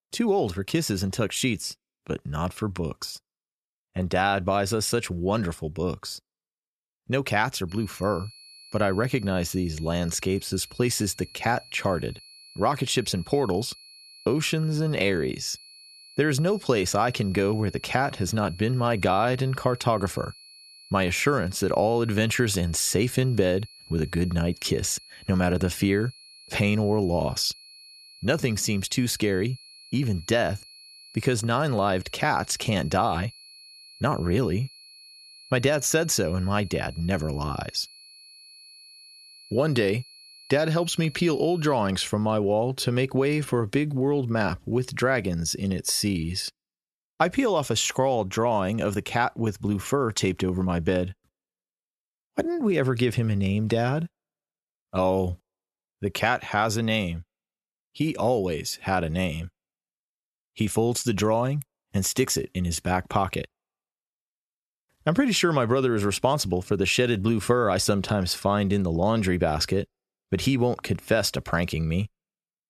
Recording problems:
high-pitched whine; faint; from 7.5 to 42 s; 4.5 kHz, 20 dB below the speech

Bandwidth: 13.5 kHz